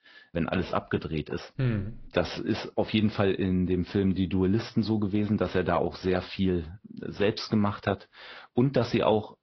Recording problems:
high frequencies cut off; noticeable; nothing above 5.5 kHz
garbled, watery; slightly

